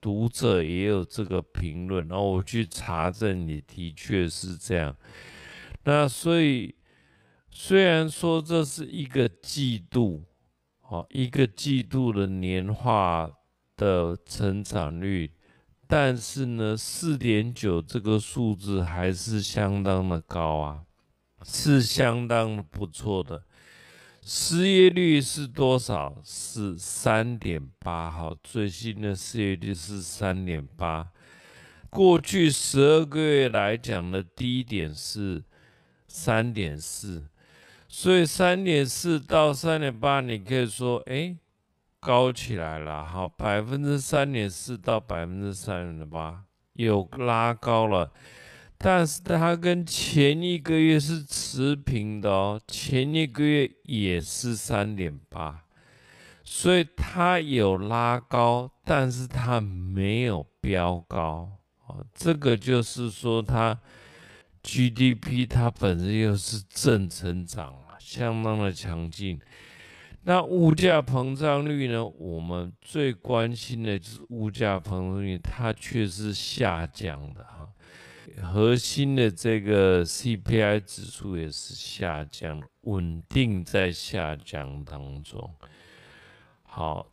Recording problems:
wrong speed, natural pitch; too slow; 0.5 times normal speed

